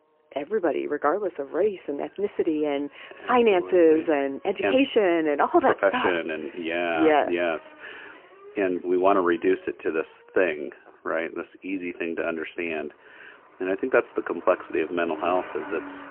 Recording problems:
phone-call audio; poor line; nothing above 3 kHz
traffic noise; faint; throughout; 20 dB below the speech

